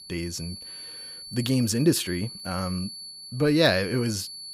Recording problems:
high-pitched whine; noticeable; throughout; 4.5 kHz, 10 dB below the speech

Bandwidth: 15 kHz